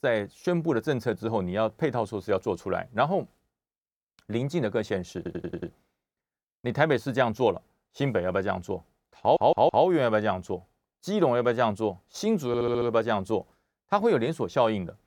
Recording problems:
audio stuttering; at 5 s, at 9 s and at 12 s

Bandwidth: 18.5 kHz